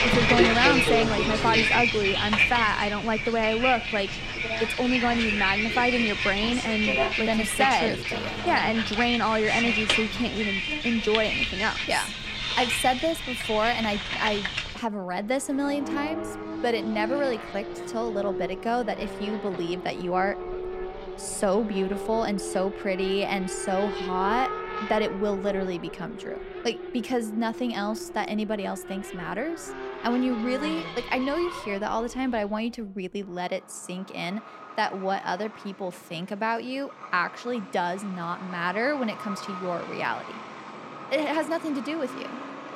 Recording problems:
traffic noise; loud; throughout; as loud as the speech

